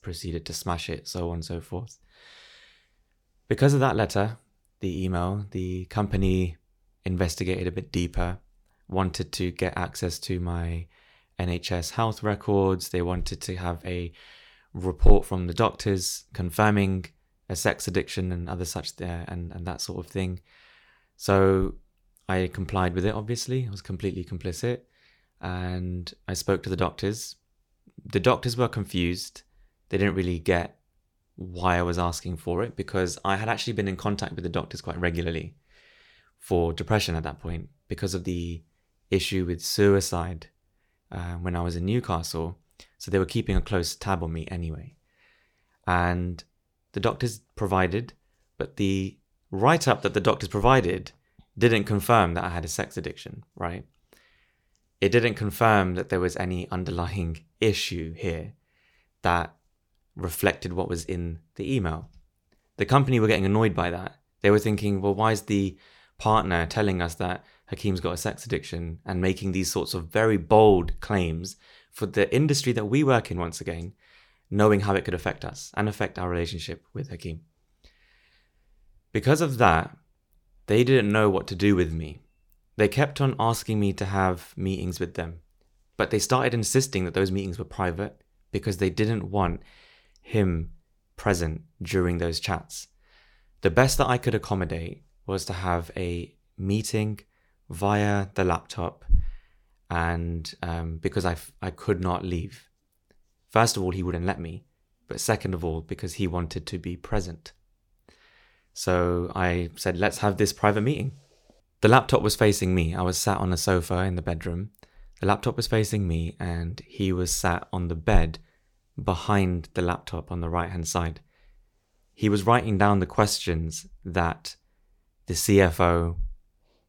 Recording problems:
none

